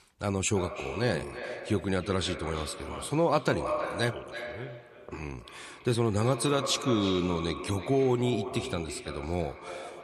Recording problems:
echo of what is said; strong; throughout; 330 ms later, 9 dB below the speech

